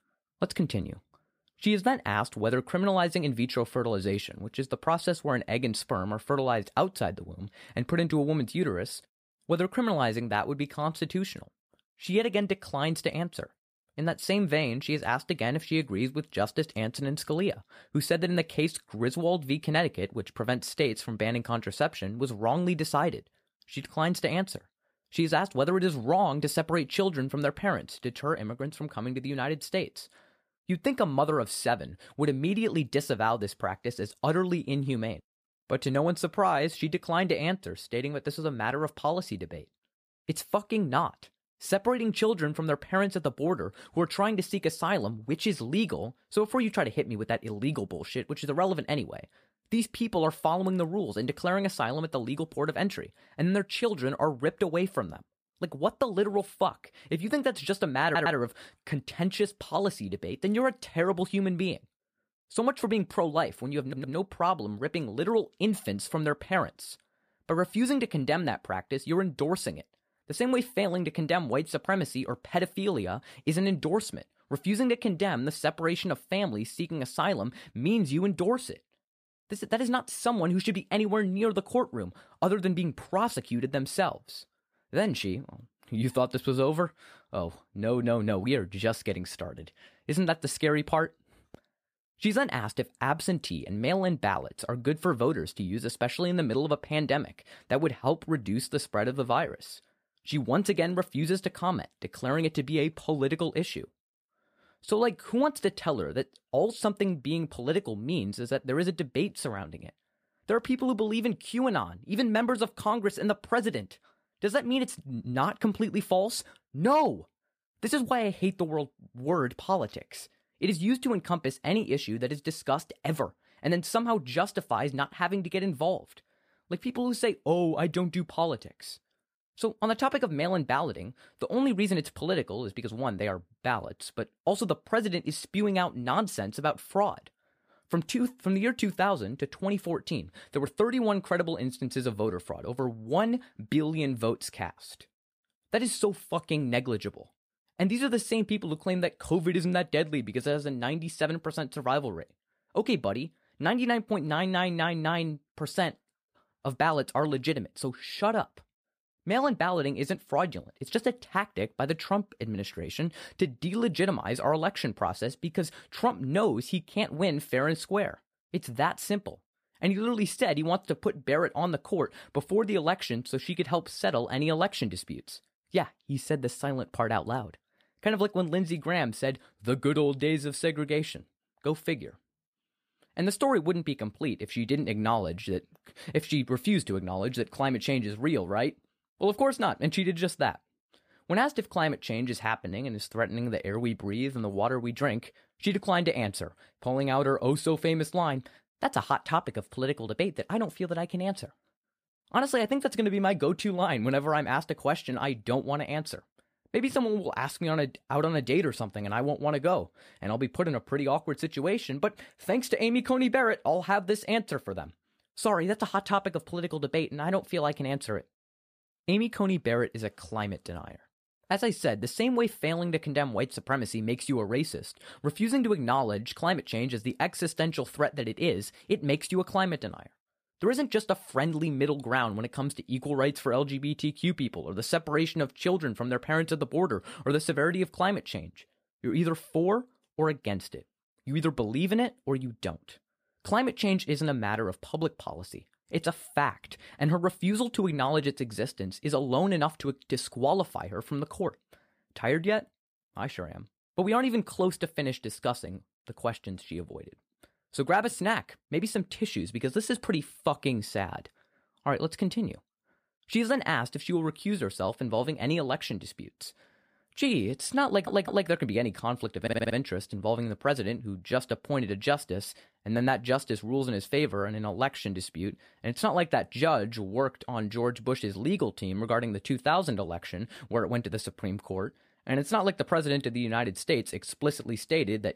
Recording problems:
audio stuttering; 4 times, first at 58 s

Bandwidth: 15 kHz